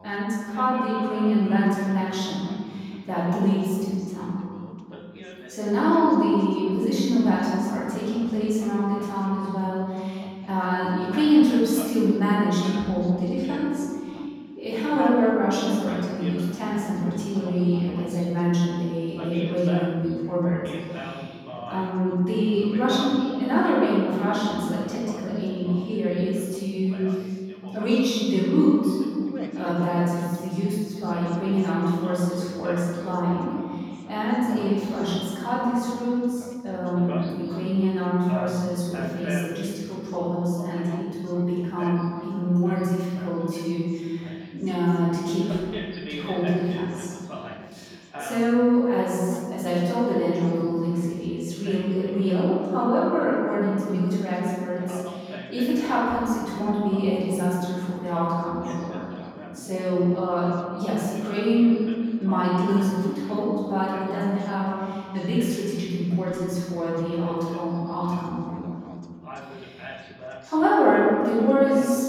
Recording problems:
room echo; strong; dies away in 2.2 s
off-mic speech; far
background chatter; noticeable; throughout; 2 voices, 15 dB below the speech

